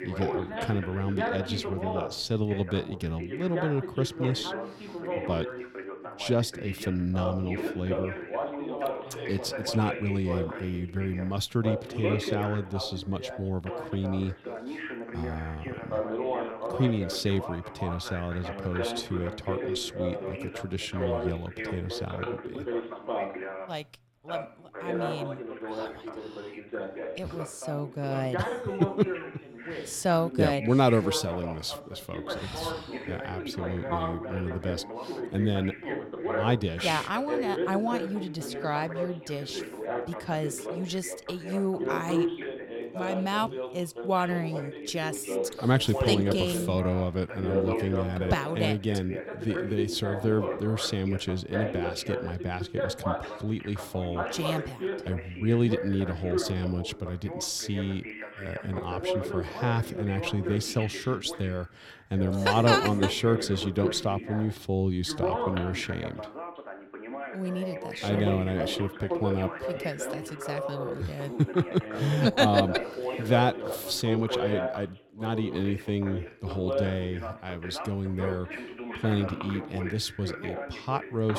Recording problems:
background chatter; loud; throughout; 2 voices, 5 dB below the speech
abrupt cut into speech; at the end

